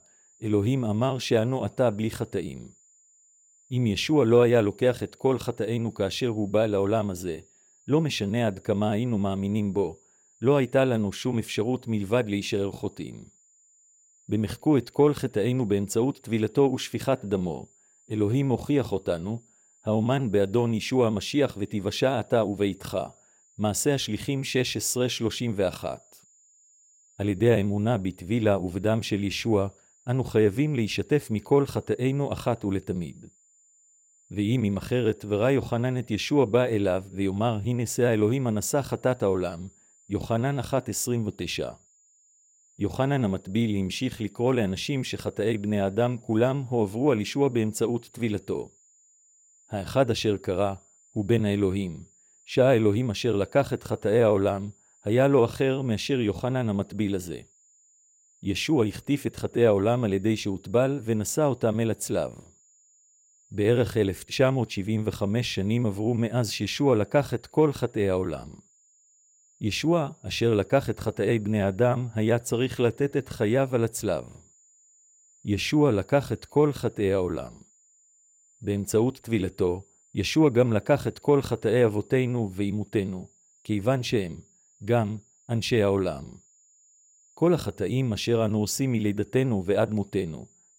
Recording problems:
high-pitched whine; faint; throughout; 7 kHz, 30 dB below the speech

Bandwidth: 16 kHz